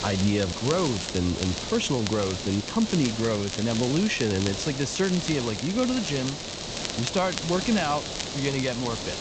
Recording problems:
high frequencies cut off; noticeable; nothing above 8 kHz
hiss; loud; throughout; 6 dB below the speech
crackle, like an old record; loud; 10 dB below the speech

